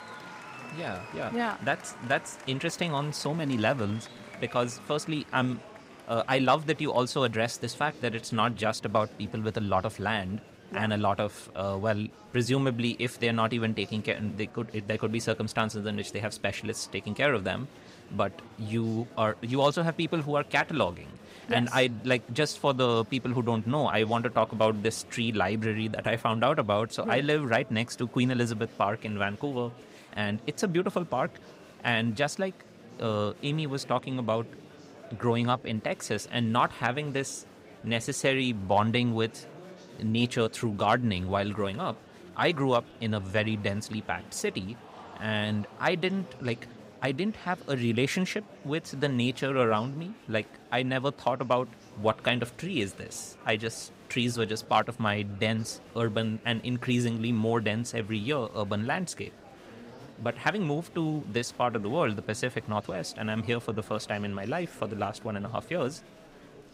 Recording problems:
murmuring crowd; noticeable; throughout; 20 dB below the speech

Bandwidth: 15.5 kHz